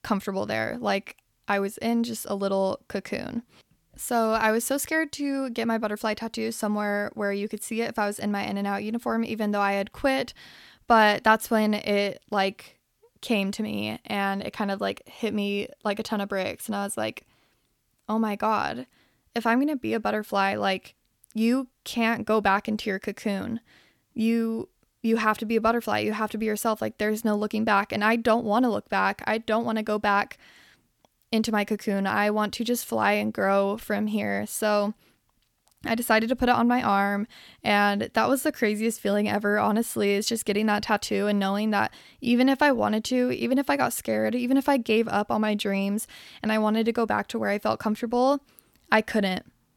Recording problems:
none

